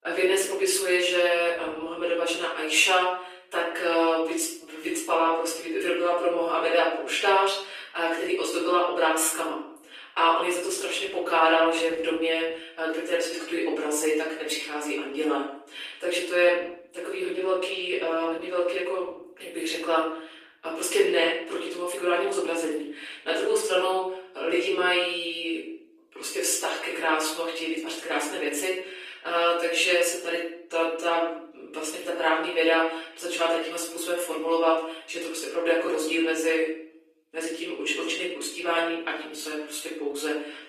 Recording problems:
off-mic speech; far
thin; very; fading below 300 Hz
room echo; noticeable; dies away in 0.5 s
garbled, watery; slightly

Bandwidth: 15 kHz